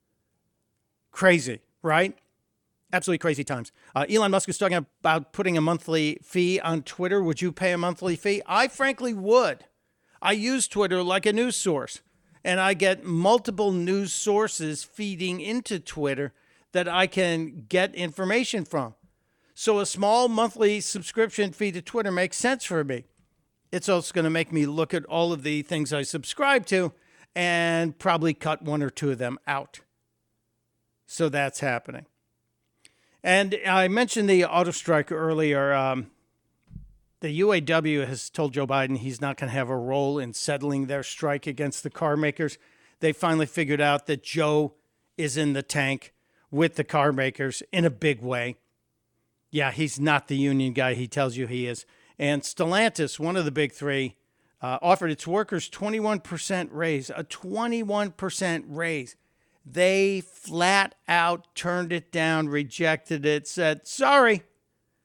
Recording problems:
uneven, jittery; strongly; from 3 s to 1:03

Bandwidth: 18.5 kHz